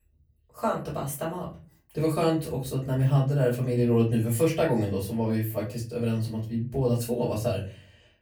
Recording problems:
off-mic speech; far
room echo; slight; dies away in 0.3 s

